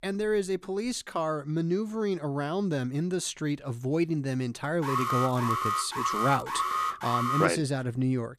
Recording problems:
crackling; very faint; at 5 s, at 5.5 s and at 6 s; 20 dB below the speech
alarm; loud; from 5 to 7.5 s; peak 2 dB above the speech

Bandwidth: 14.5 kHz